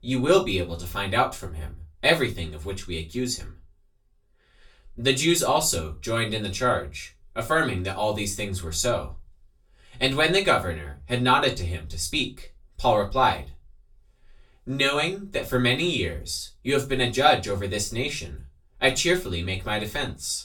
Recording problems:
off-mic speech; far
room echo; very slight; dies away in 0.2 s

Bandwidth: 18.5 kHz